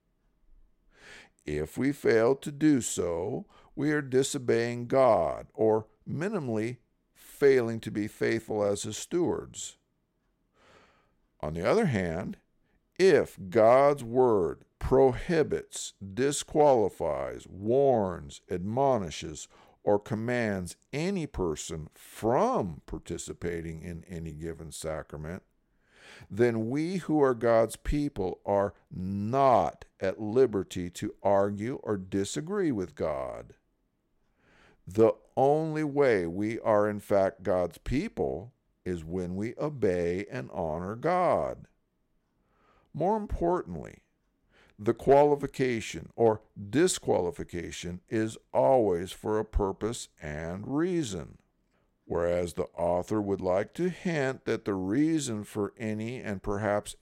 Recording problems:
none

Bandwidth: 16 kHz